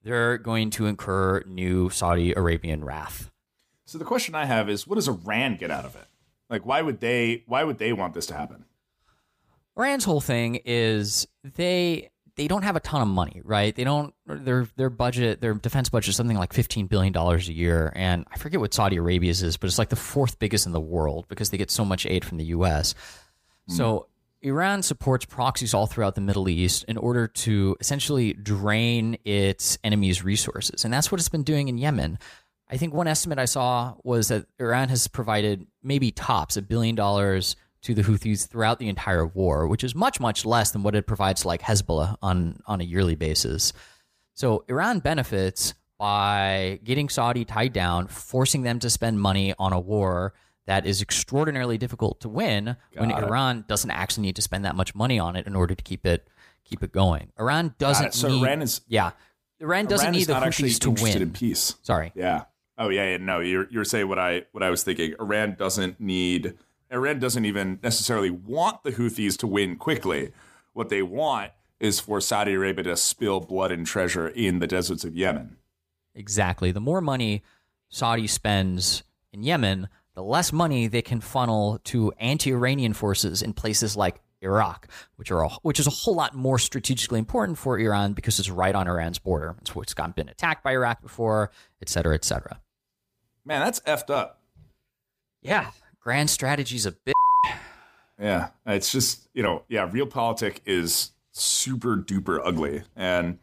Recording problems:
none

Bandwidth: 15 kHz